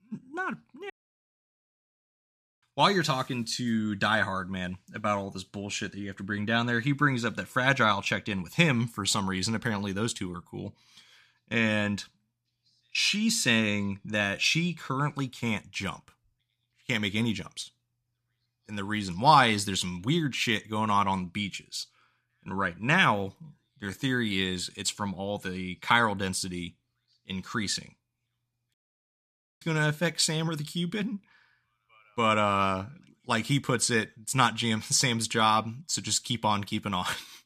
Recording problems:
audio cutting out; at 1 s for 1.5 s and at 29 s for 1 s

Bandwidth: 14.5 kHz